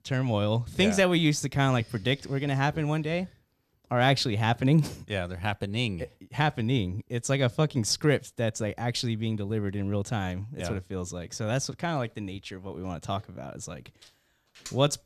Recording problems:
none

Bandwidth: 14.5 kHz